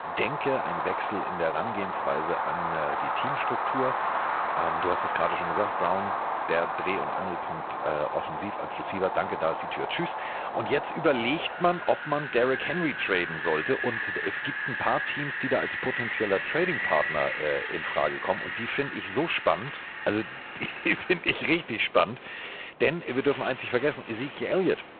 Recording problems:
phone-call audio; poor line
wind in the background; loud; throughout; 2 dB below the speech

